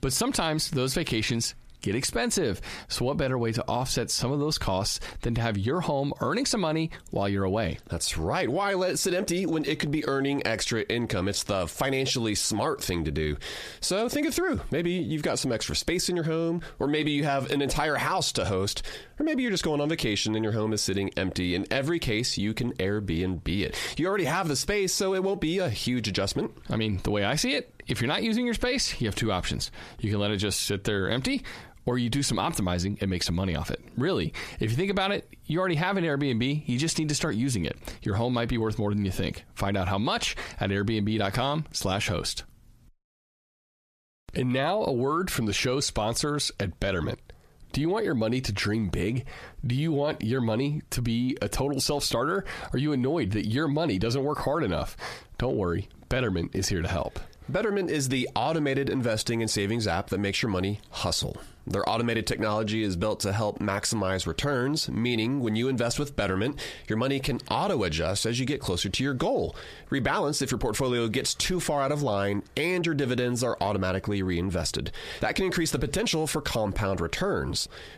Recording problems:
squashed, flat; heavily

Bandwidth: 14.5 kHz